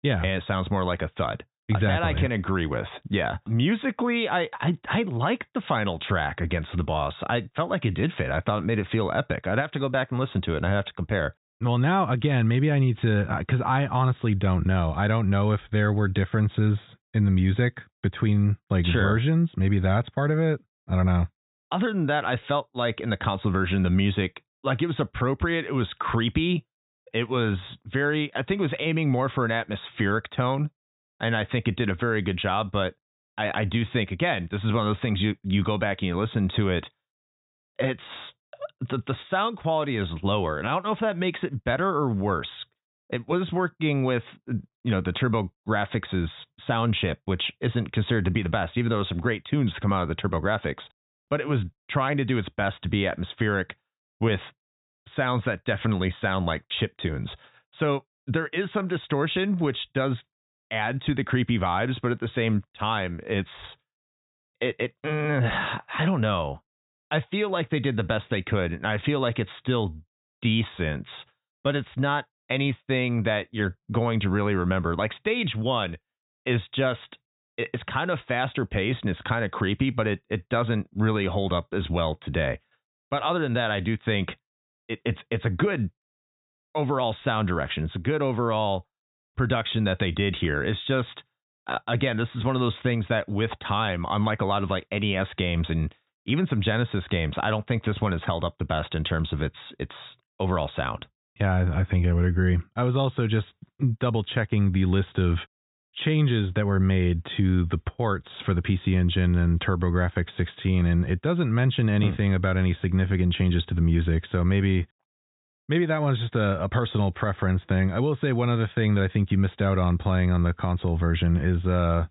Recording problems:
high frequencies cut off; severe; nothing above 4 kHz

